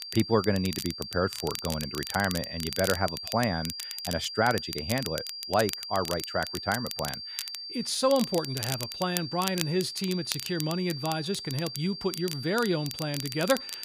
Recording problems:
high-pitched whine; loud; throughout; 4.5 kHz, 7 dB below the speech
crackle, like an old record; loud; 9 dB below the speech

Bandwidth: 15 kHz